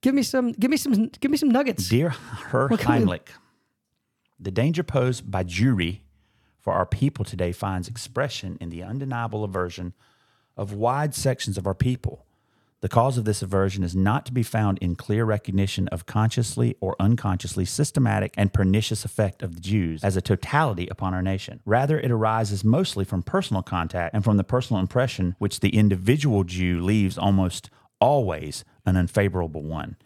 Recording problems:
none

